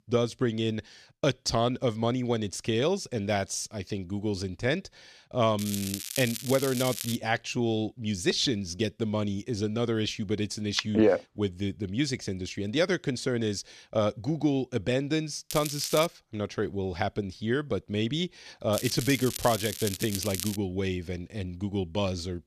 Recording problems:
crackling; loud; from 5.5 to 7 s, at 16 s and from 19 to 21 s; 6 dB below the speech

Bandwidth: 14 kHz